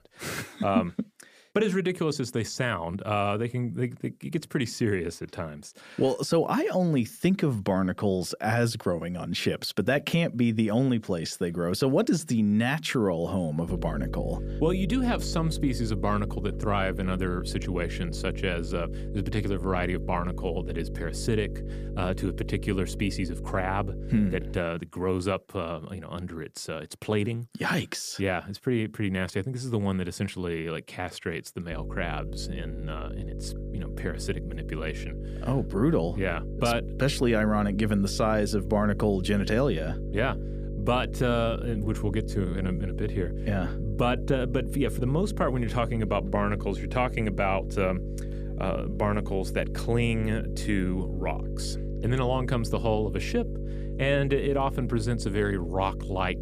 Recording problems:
electrical hum; noticeable; from 14 to 25 s and from 32 s on; 50 Hz, 15 dB below the speech

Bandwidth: 15 kHz